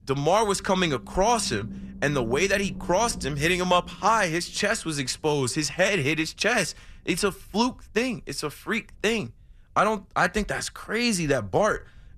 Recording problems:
low rumble; faint; throughout; 25 dB below the speech

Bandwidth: 14 kHz